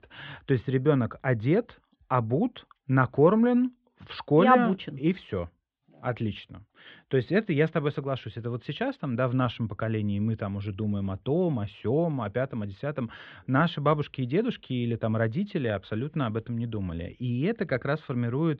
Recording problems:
muffled; very; fading above 3.5 kHz

